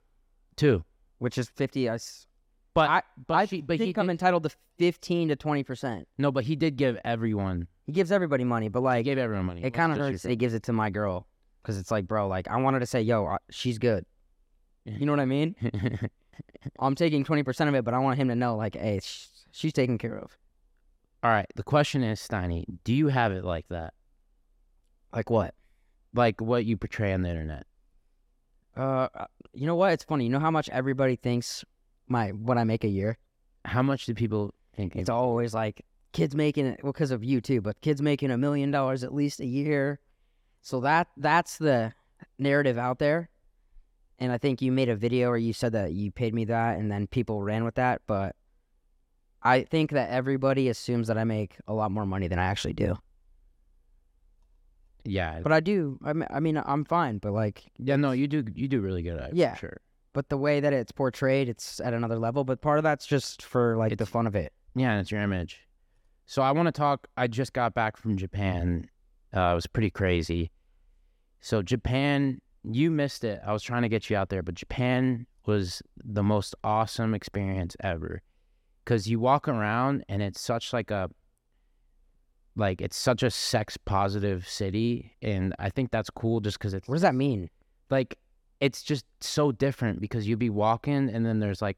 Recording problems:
none

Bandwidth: 16.5 kHz